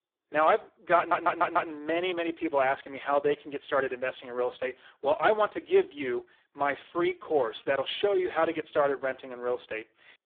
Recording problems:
phone-call audio; poor line
audio stuttering; at 1 s

